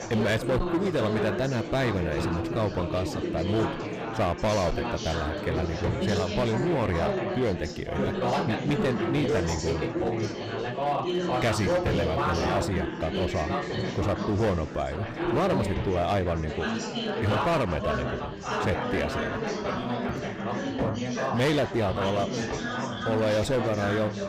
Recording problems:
distortion; slight; 10% of the sound clipped
chatter from many people; loud; throughout; 1 dB below the speech

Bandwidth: 15 kHz